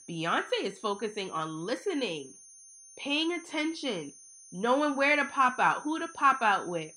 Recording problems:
muffled; very slightly; fading above 3.5 kHz
high-pitched whine; faint; throughout; 6.5 kHz, 20 dB below the speech

